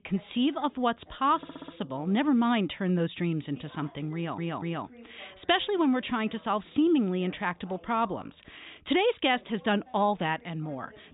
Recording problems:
high frequencies cut off; severe; nothing above 4 kHz
voice in the background; faint; throughout; 25 dB below the speech
audio stuttering; at 1.5 s and at 4 s

